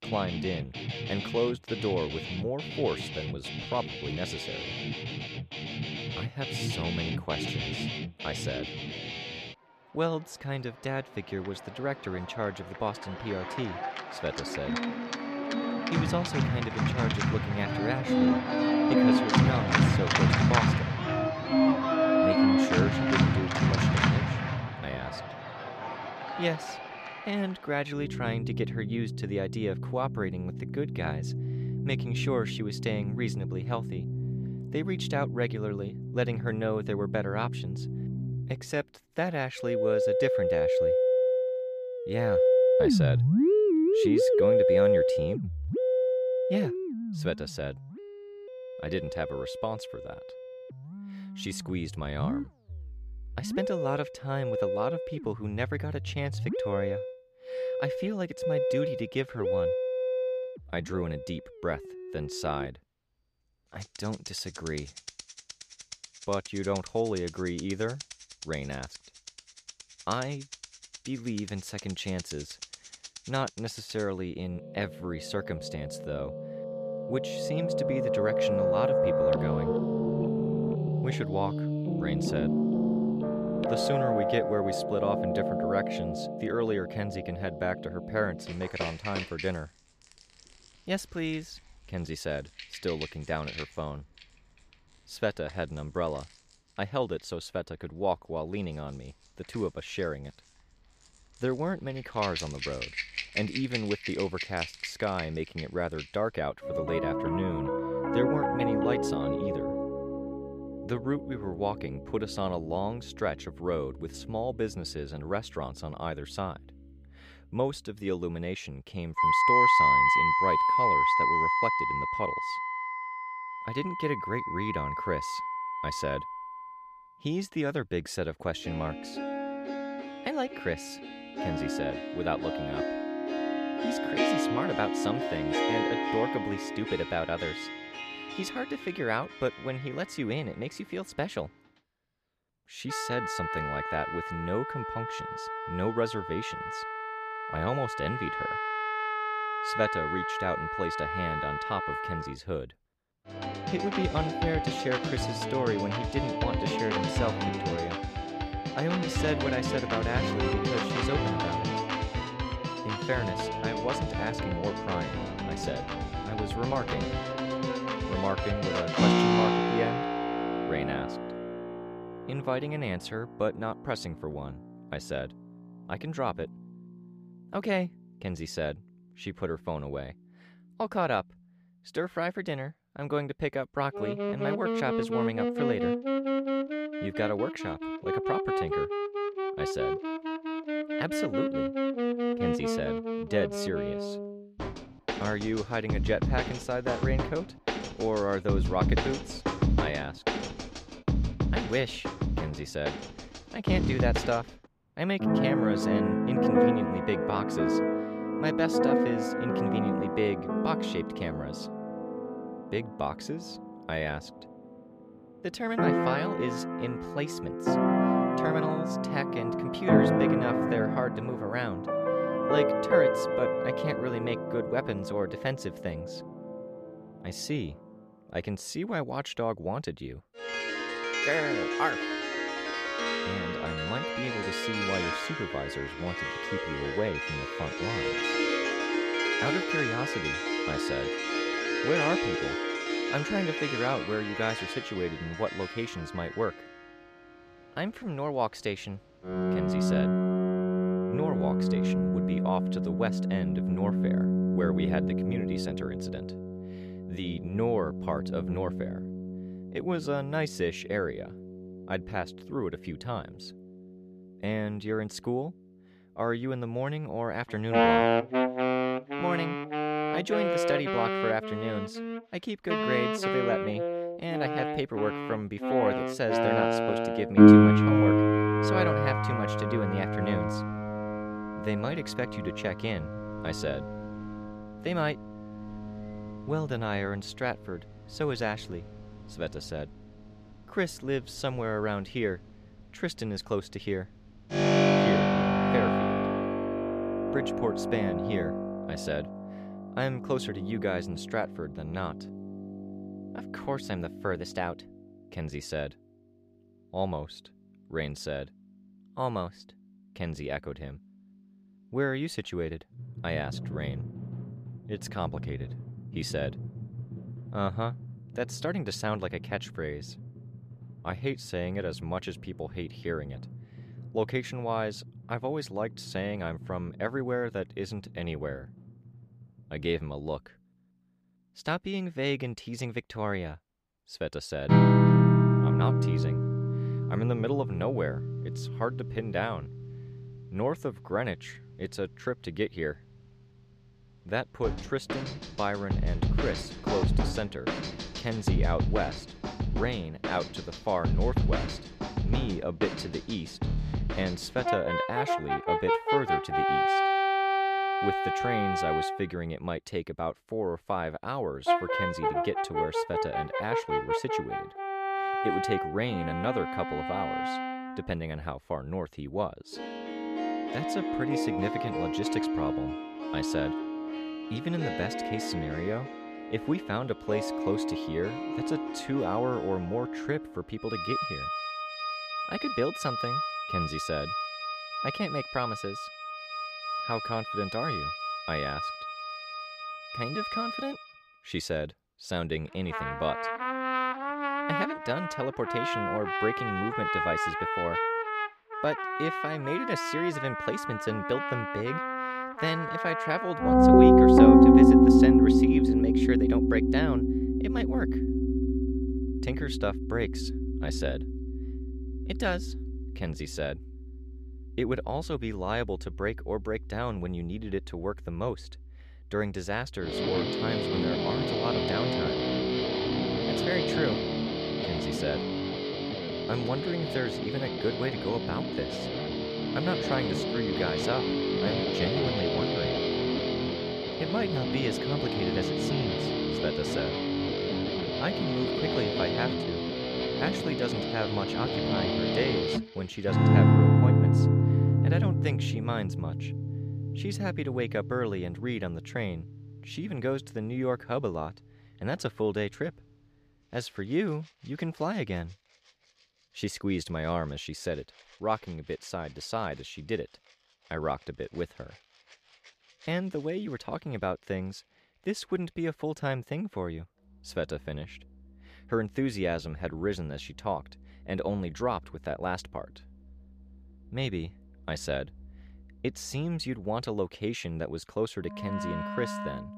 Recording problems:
background music; very loud; throughout; 5 dB above the speech

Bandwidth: 15 kHz